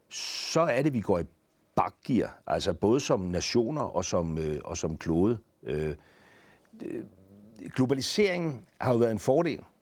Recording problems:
garbled, watery; slightly

